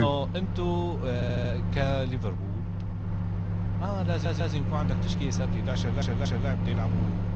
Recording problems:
garbled, watery; slightly
household noises; very loud; throughout; 3 dB above the speech
abrupt cut into speech; at the start
audio stuttering; at 1 s, at 4 s and at 6 s

